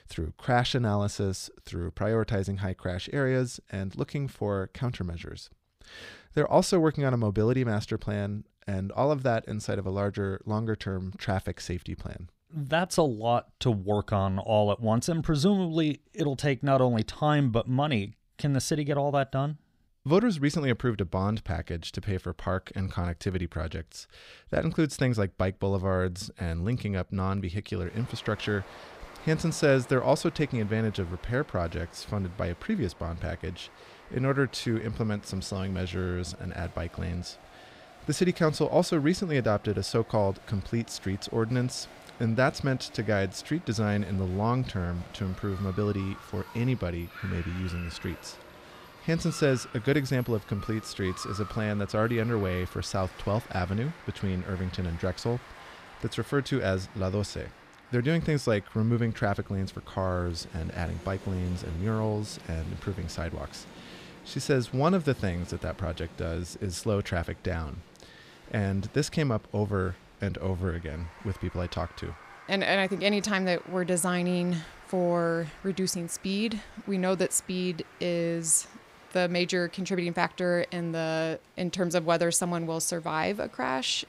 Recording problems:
crowd noise; noticeable; from 28 s on; 20 dB below the speech

